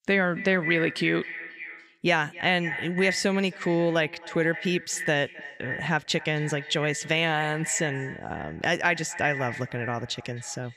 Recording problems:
echo of what is said; strong; throughout; 260 ms later, 9 dB below the speech

